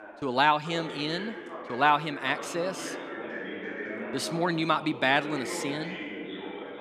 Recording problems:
background chatter; noticeable; throughout; 2 voices, 10 dB below the speech

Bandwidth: 15 kHz